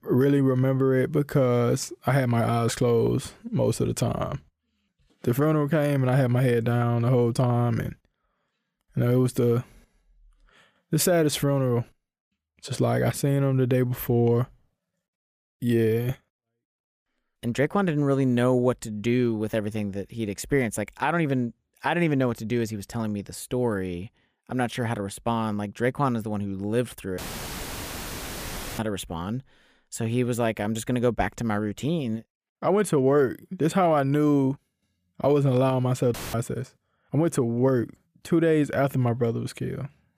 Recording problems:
audio cutting out; filled with static; at 27 s for 1.5 s and at 36 s

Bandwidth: 15 kHz